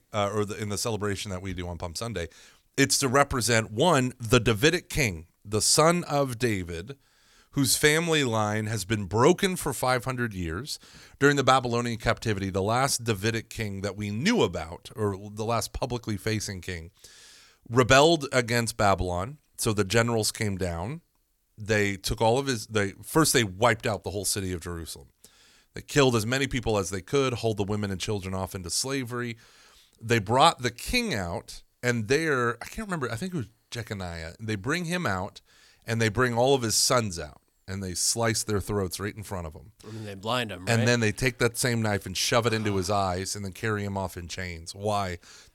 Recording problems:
none

